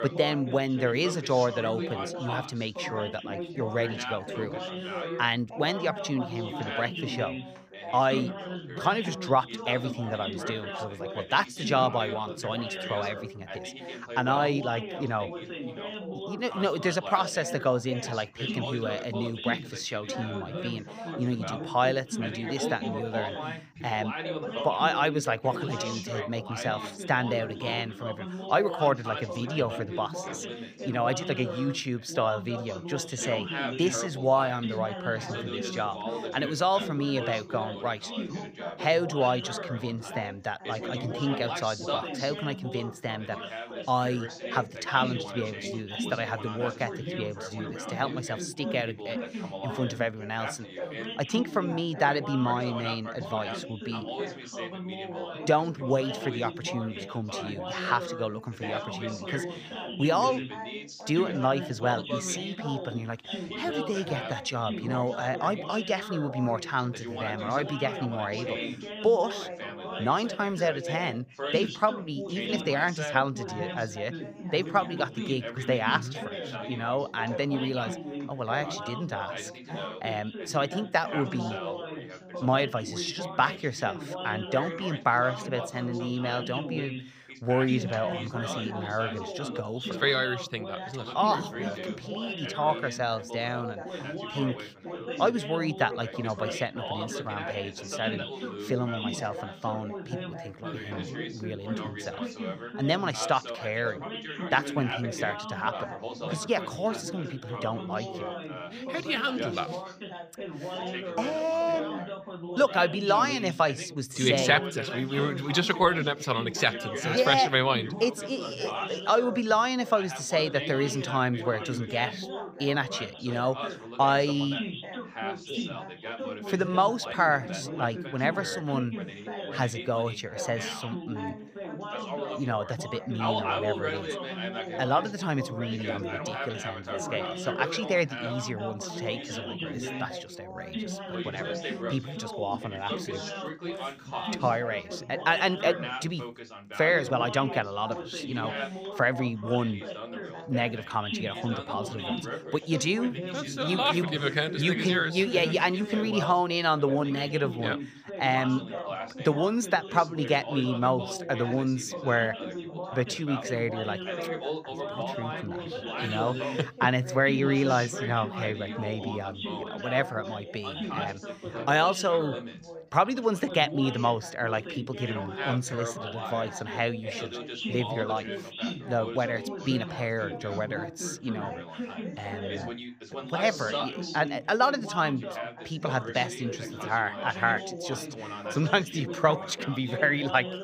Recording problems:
background chatter; loud; throughout; 3 voices, 7 dB below the speech

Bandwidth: 15 kHz